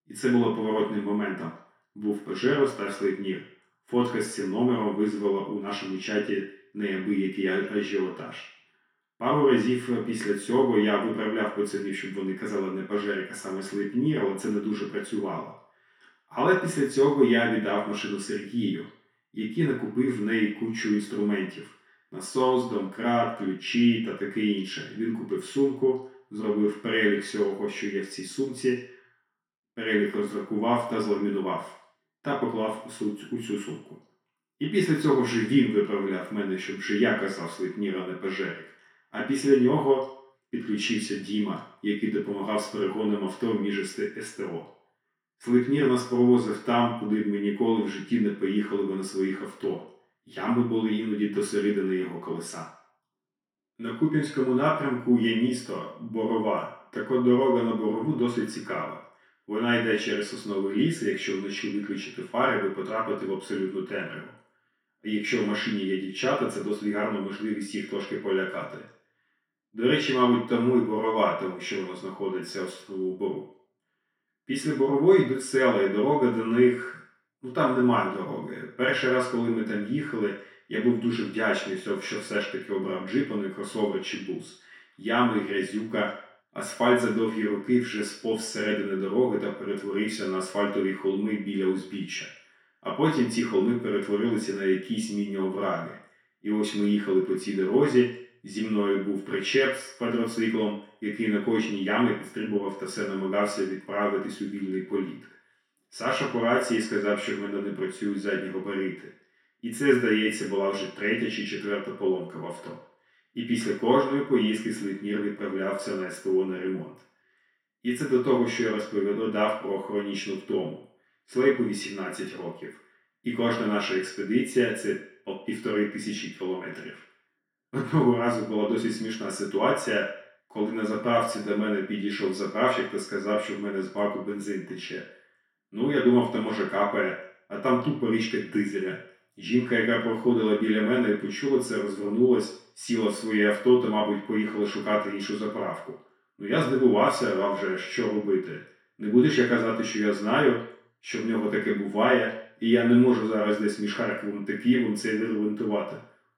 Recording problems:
off-mic speech; far
room echo; noticeable; dies away in 0.6 s

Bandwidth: 17 kHz